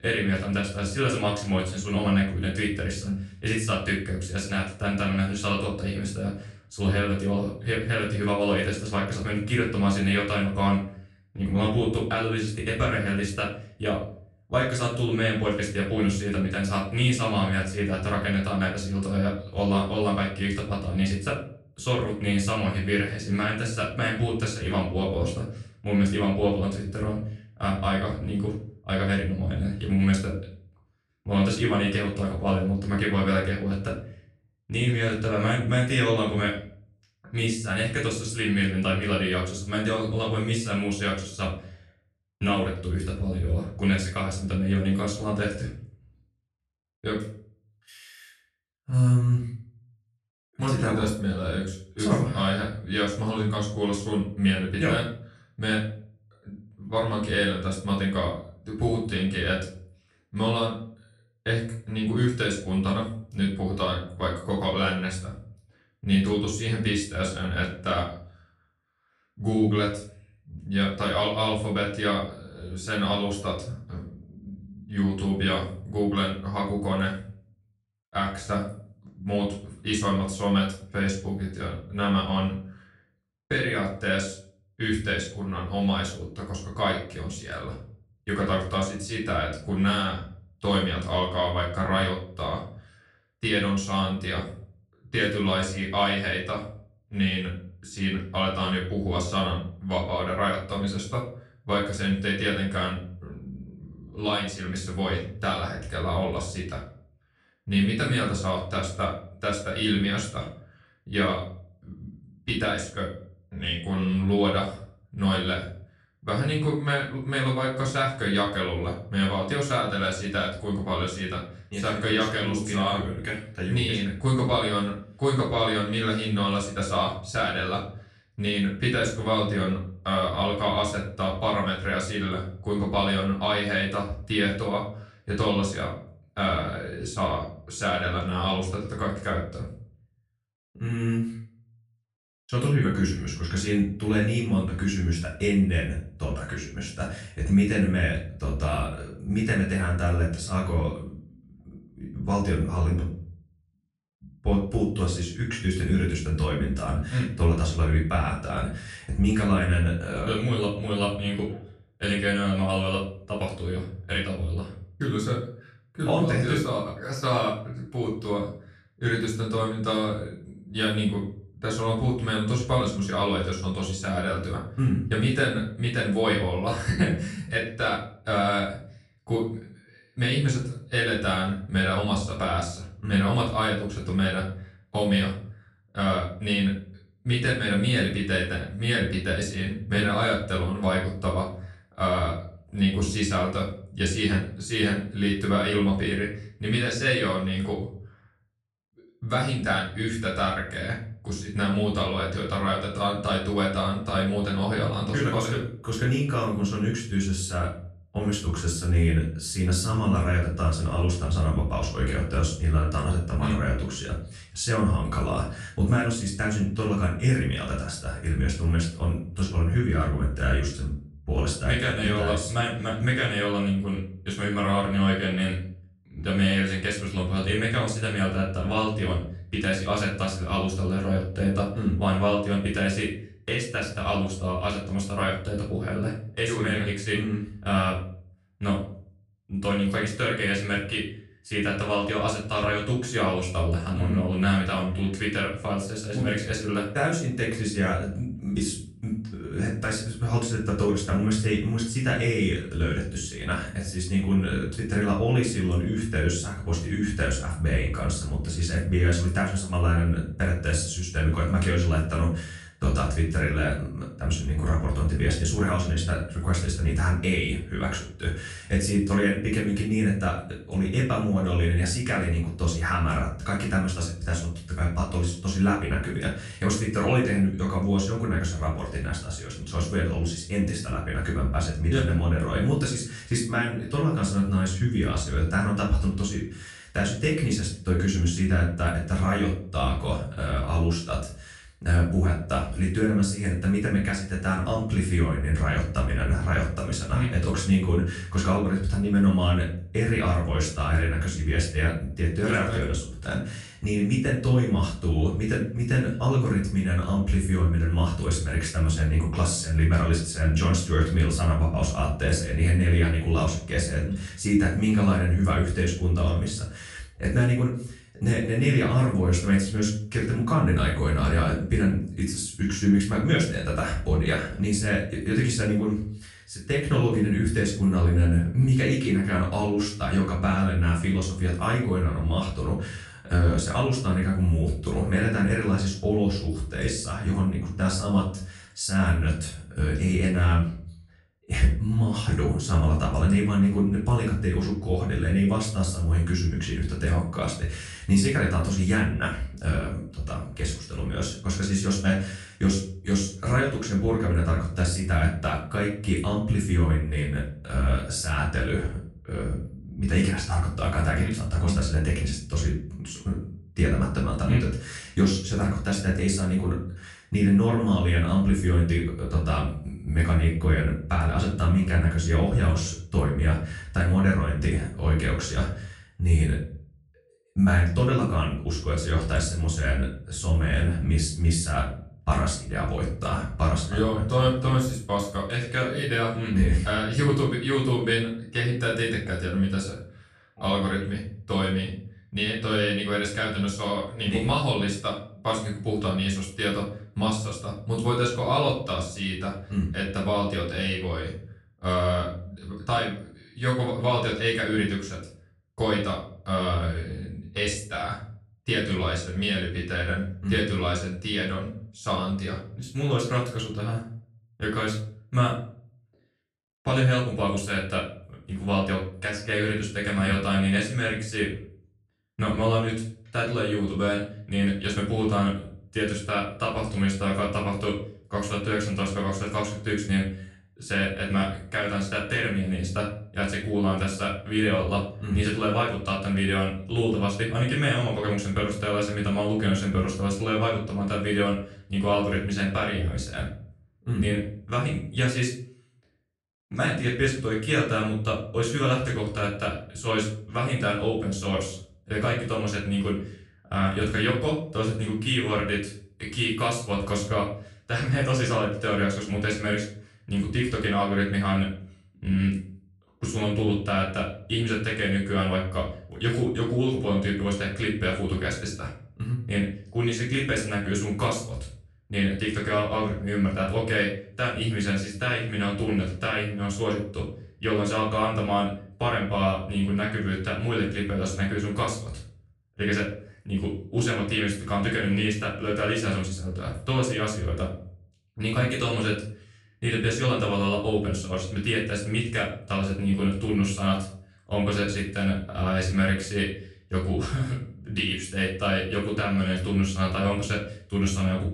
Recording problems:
off-mic speech; far
room echo; noticeable; dies away in 0.5 s

